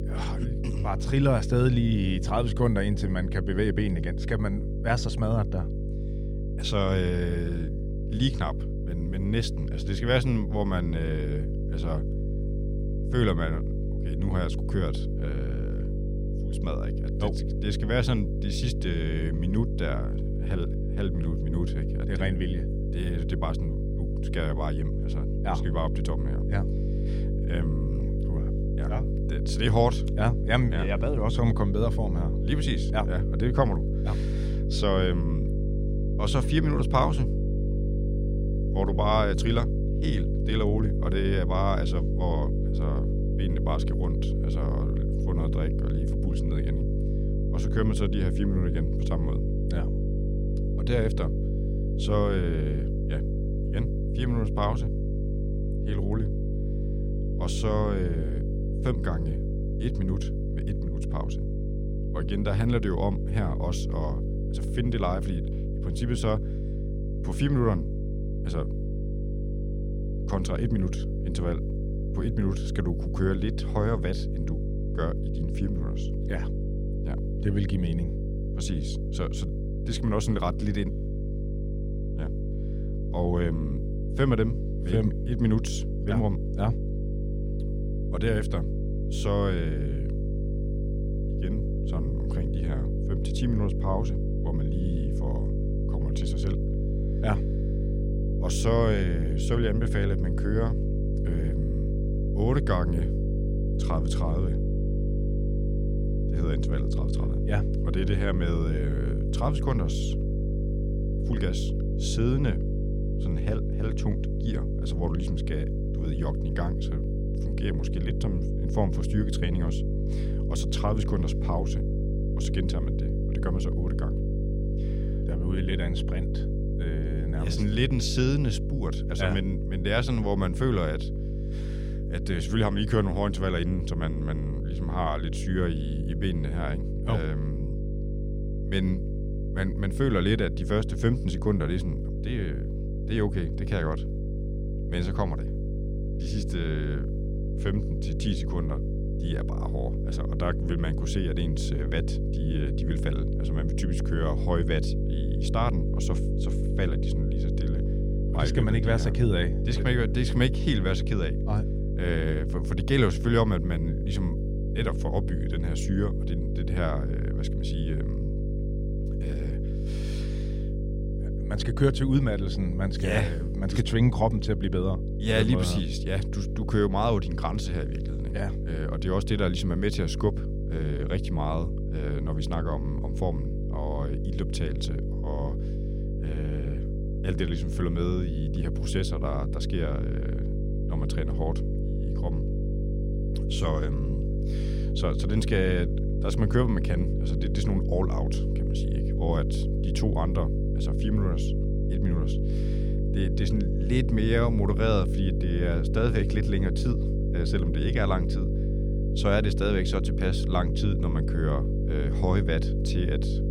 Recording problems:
electrical hum; loud; throughout; 50 Hz, 6 dB below the speech

